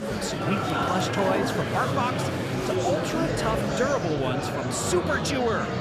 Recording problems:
murmuring crowd; very loud; throughout; 1 dB above the speech

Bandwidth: 14.5 kHz